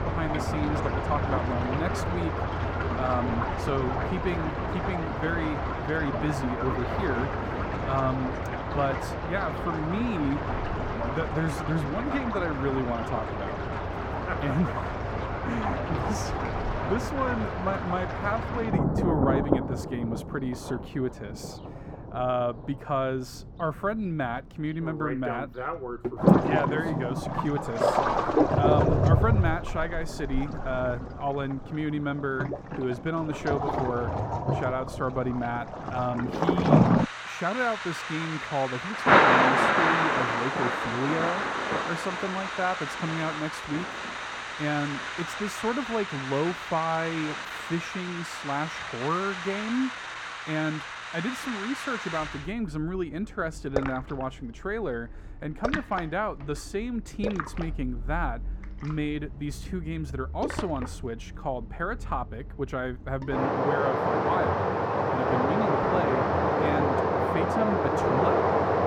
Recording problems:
muffled; slightly; fading above 2.5 kHz
rain or running water; very loud; throughout; 3 dB above the speech

